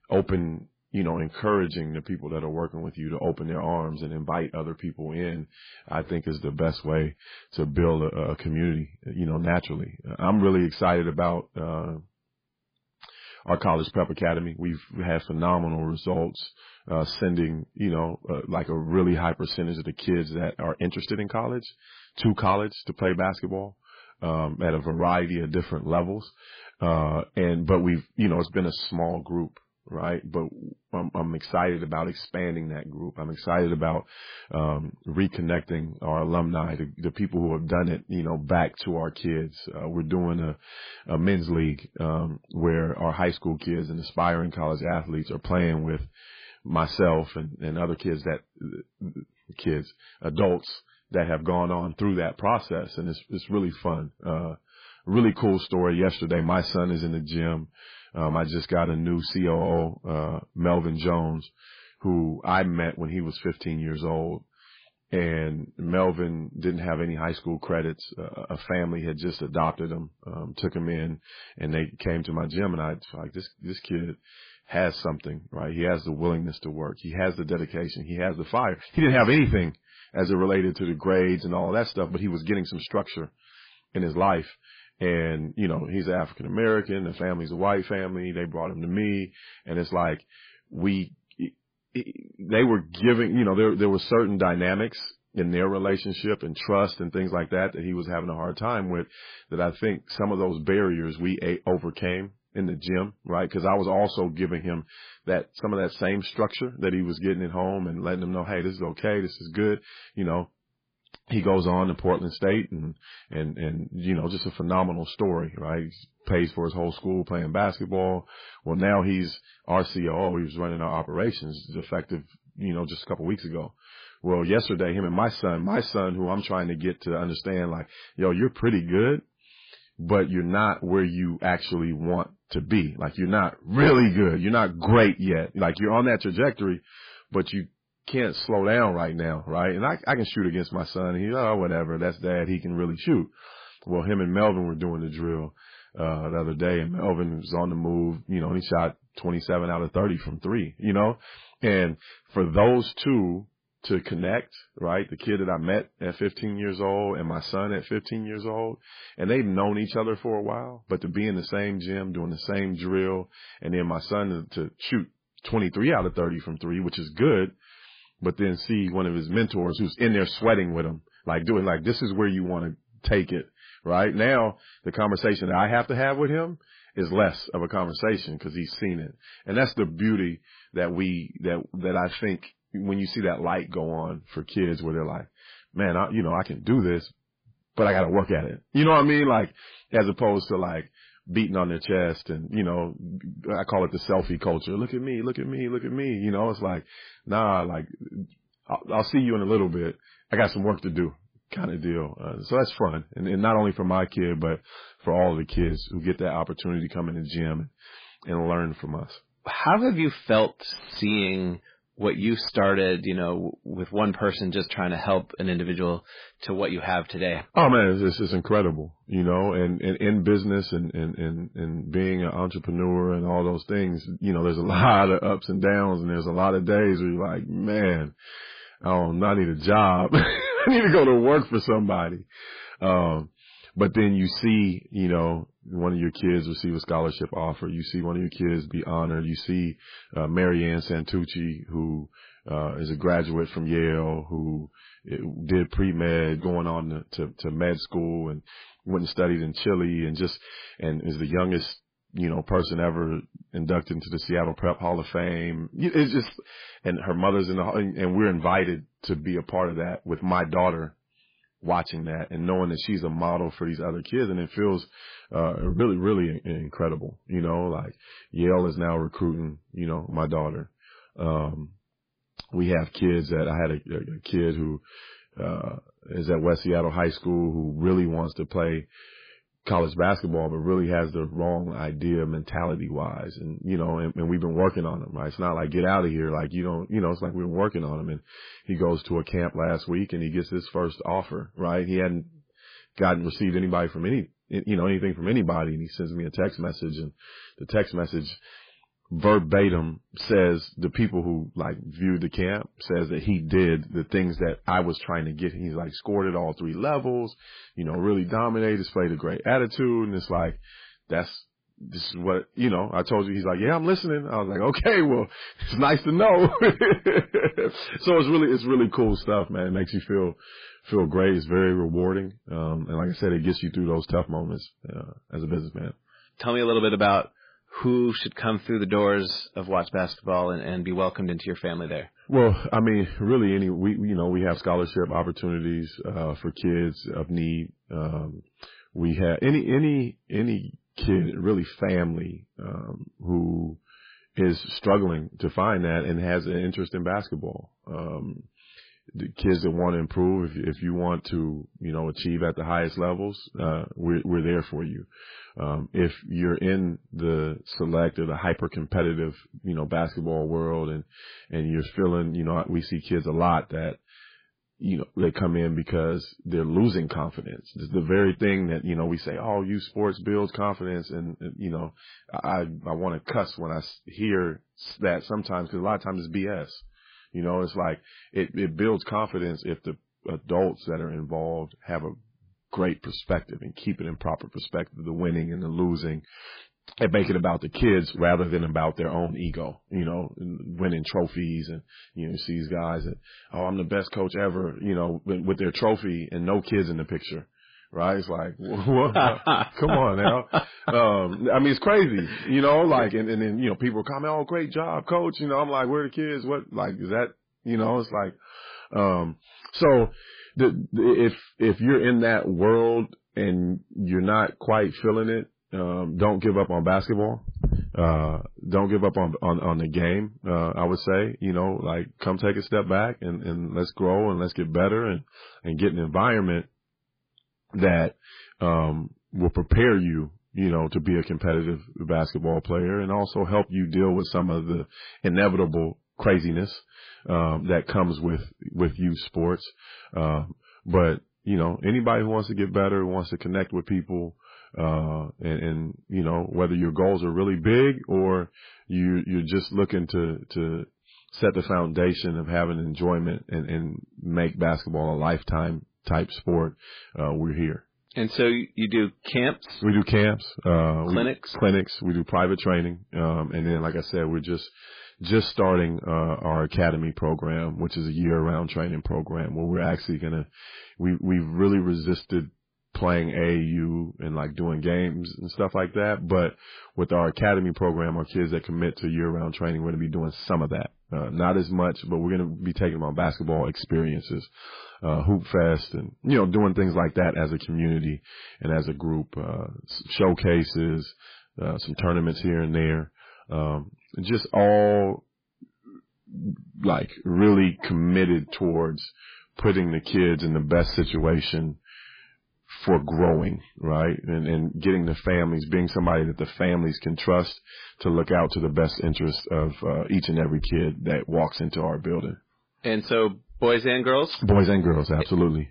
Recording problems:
garbled, watery; badly
distortion; slight; 10 dB below the speech

